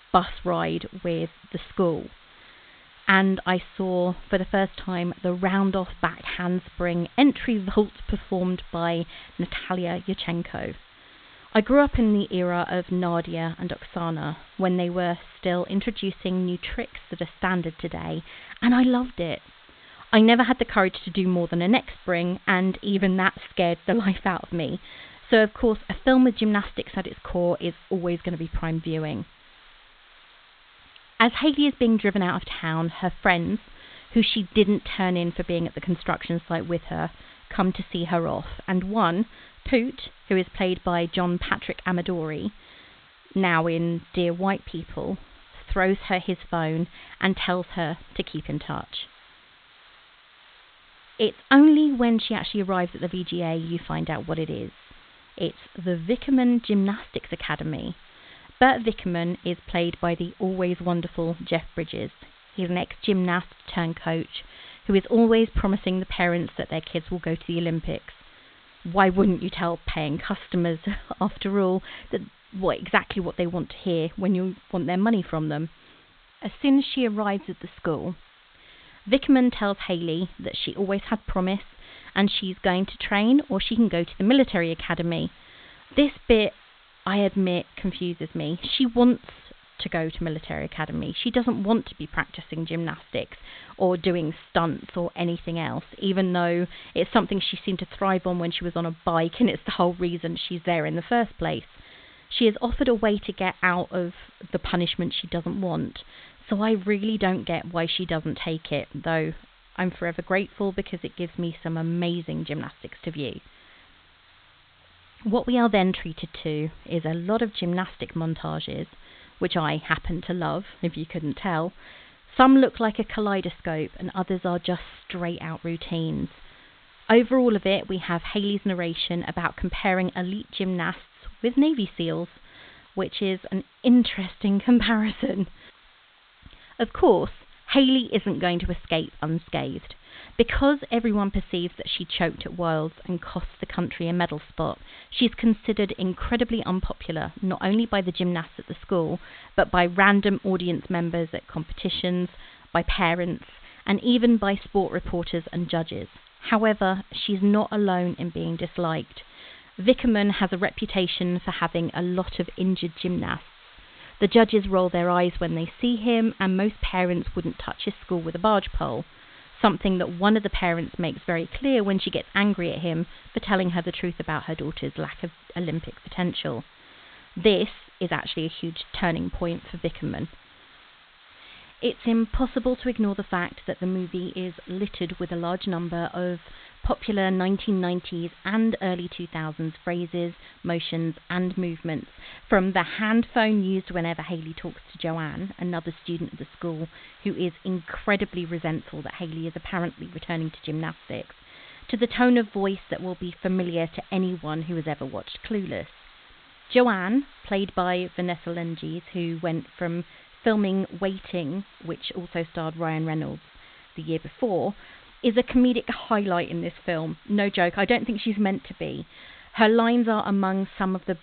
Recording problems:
high frequencies cut off; severe; nothing above 4 kHz
hiss; faint; throughout; 25 dB below the speech

